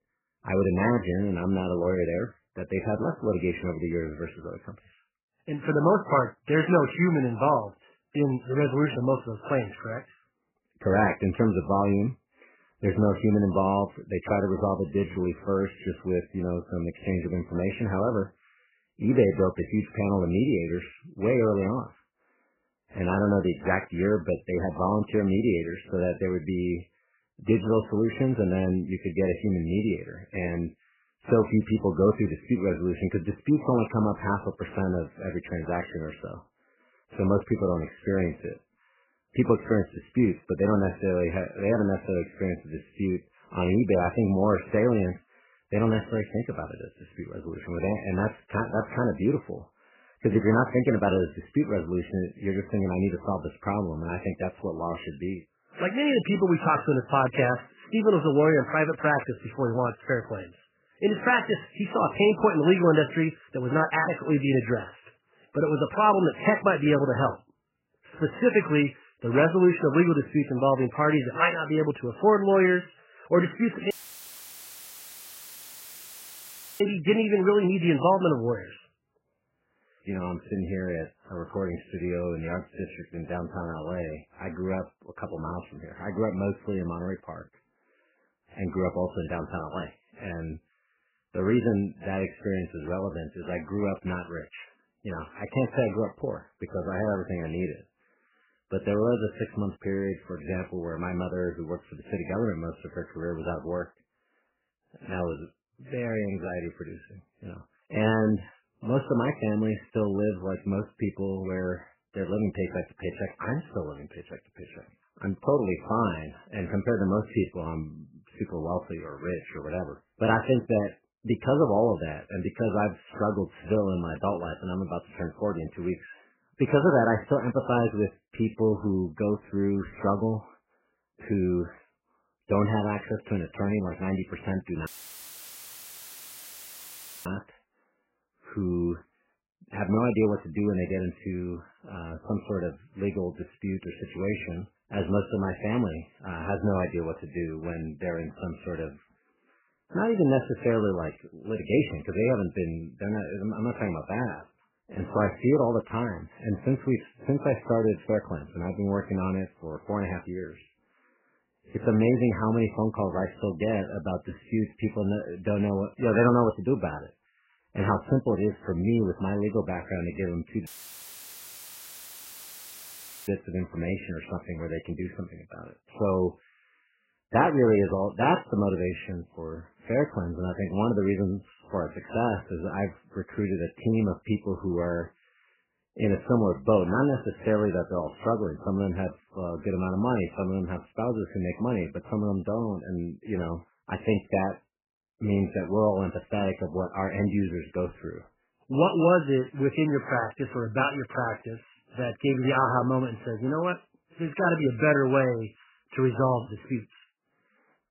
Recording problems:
garbled, watery; badly; nothing above 3 kHz
audio cutting out; filled with static; at 1:14 for 3 s, at 2:15 for 2.5 s and at 2:51 for 2.5 s

